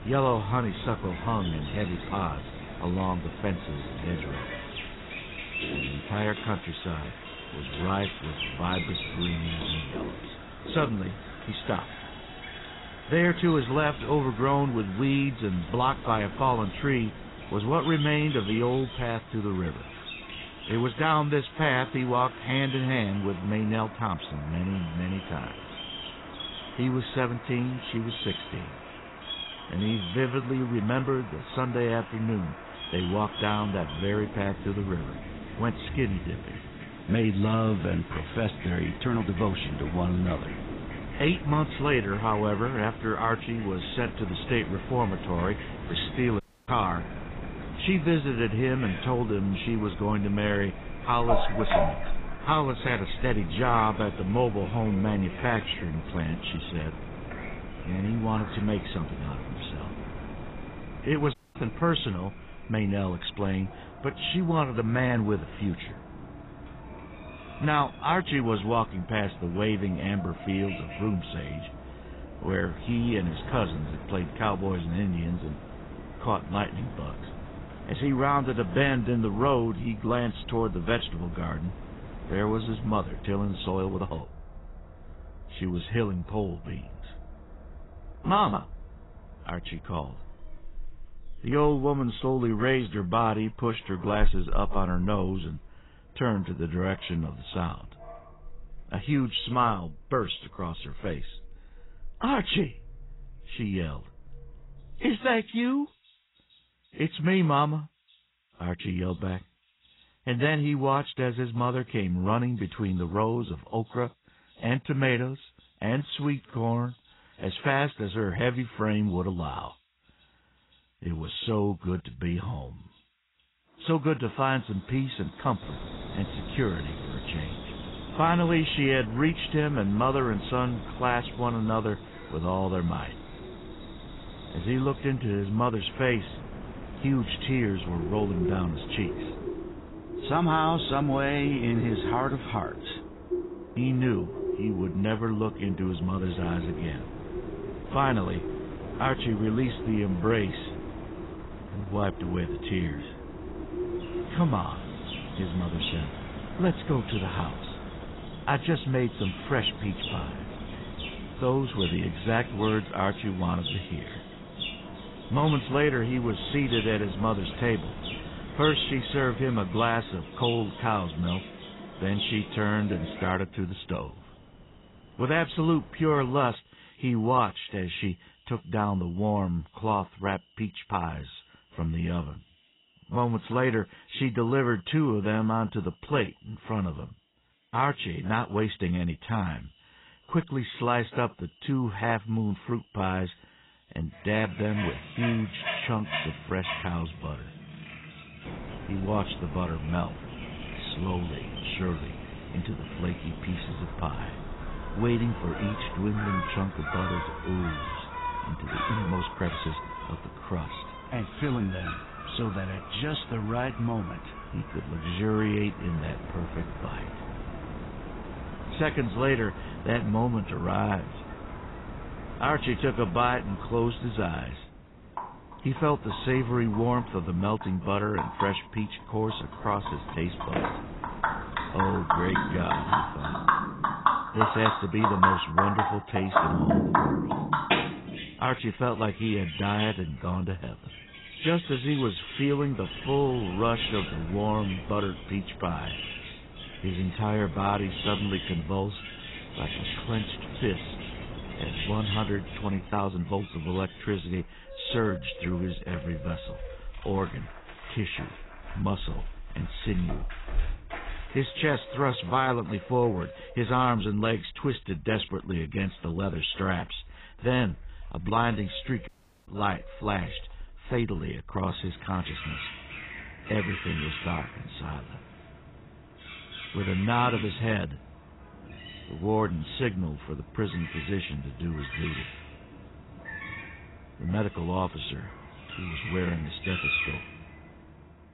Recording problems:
garbled, watery; badly; nothing above 4 kHz
animal sounds; loud; throughout; 8 dB below the speech
wind noise on the microphone; occasional gusts; until 1:24, from 2:06 to 2:56 and from 3:18 to 4:14; 15 dB below the speech
uneven, jittery; strongly; from 29 s to 4:35
audio cutting out; at 46 s, at 1:01 and at 4:29

